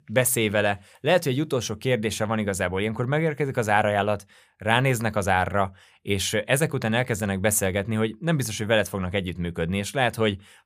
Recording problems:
none

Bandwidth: 15 kHz